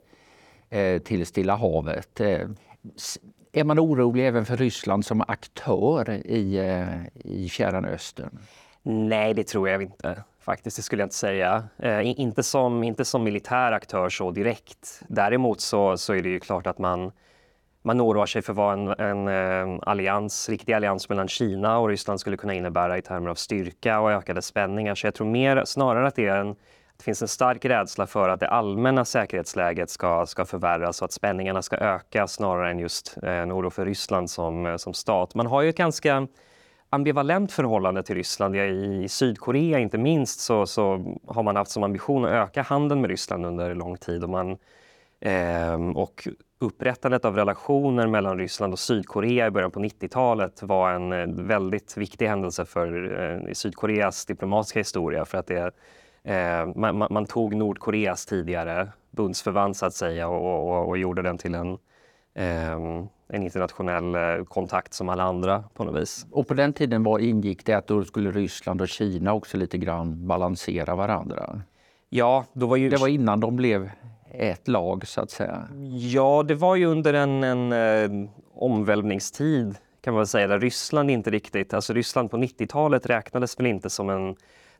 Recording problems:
none

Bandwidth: 18 kHz